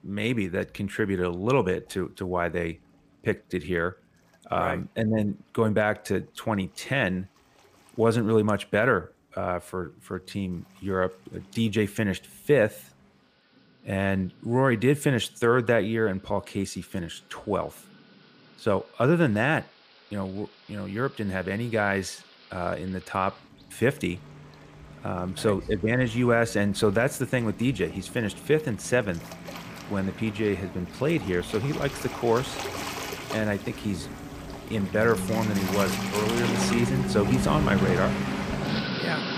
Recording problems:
rain or running water; loud; throughout; 5 dB below the speech

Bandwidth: 15 kHz